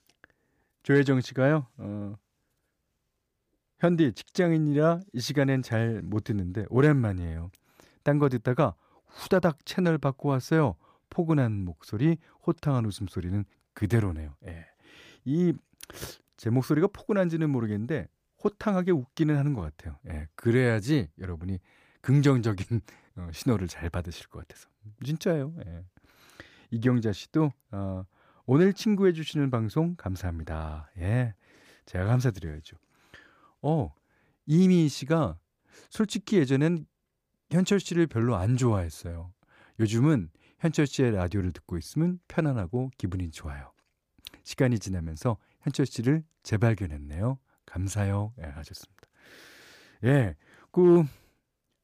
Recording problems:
none

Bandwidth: 15 kHz